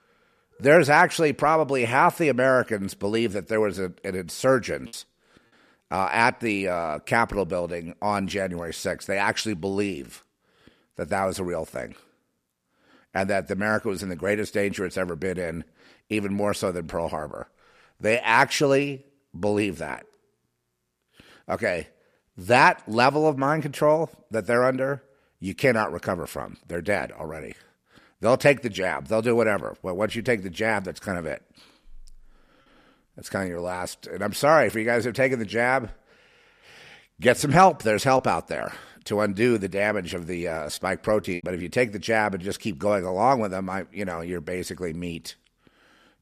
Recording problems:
choppy; occasionally; from 38 to 41 s; 4% of the speech affected

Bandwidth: 14.5 kHz